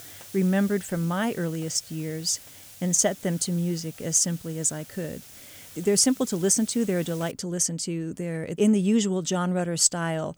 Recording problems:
hiss; noticeable; until 7.5 s; 20 dB below the speech

